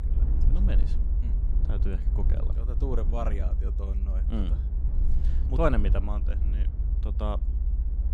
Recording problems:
low rumble; noticeable; throughout; 10 dB below the speech

